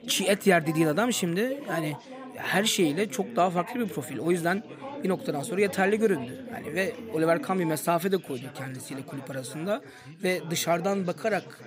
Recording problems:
chatter from many people; noticeable; throughout; 15 dB below the speech

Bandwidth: 15.5 kHz